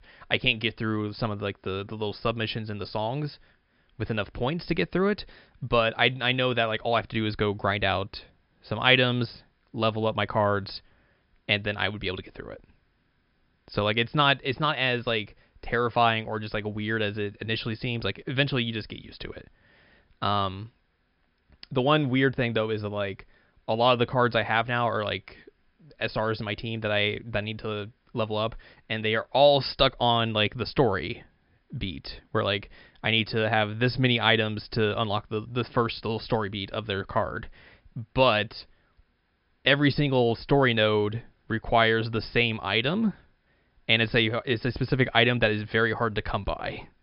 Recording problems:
high frequencies cut off; noticeable; nothing above 5.5 kHz

